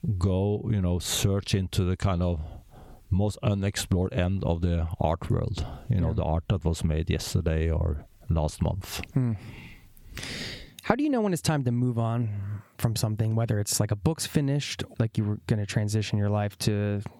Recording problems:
squashed, flat; heavily

